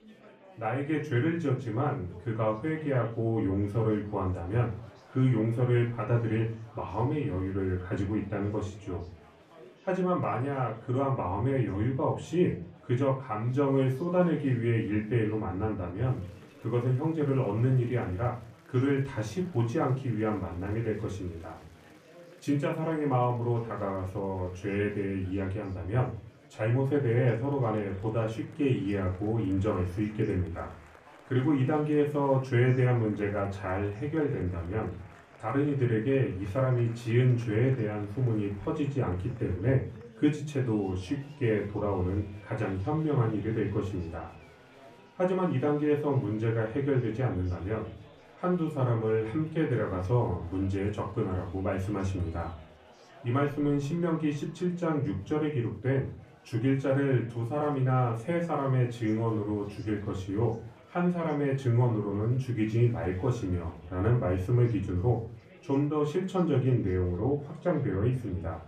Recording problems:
off-mic speech; far
room echo; slight; dies away in 0.3 s
murmuring crowd; faint; throughout; 25 dB below the speech

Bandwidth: 14.5 kHz